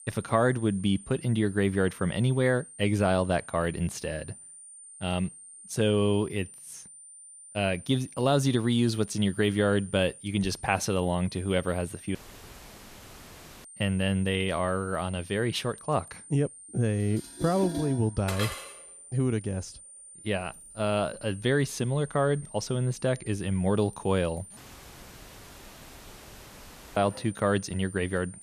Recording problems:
high-pitched whine; noticeable; throughout; 9 kHz, 15 dB below the speech
household noises; noticeable; from 17 s on; 10 dB below the speech
audio cutting out; at 12 s for 1.5 s and at 25 s for 2.5 s

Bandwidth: 14.5 kHz